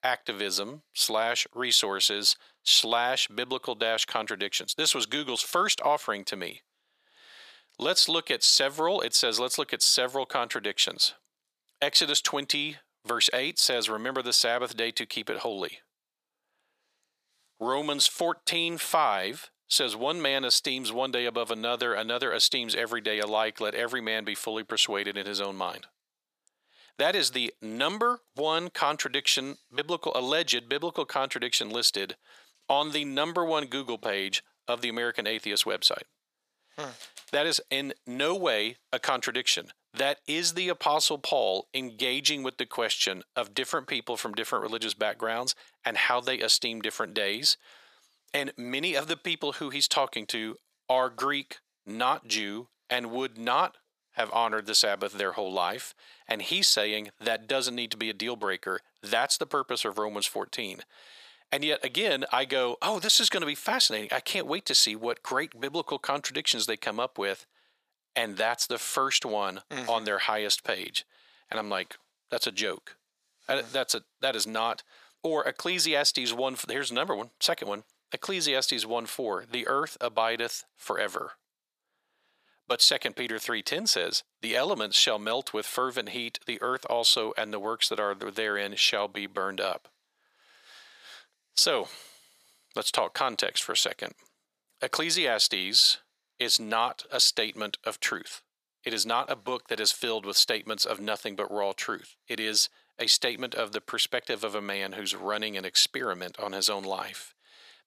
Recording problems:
thin; very; fading below 700 Hz

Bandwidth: 14.5 kHz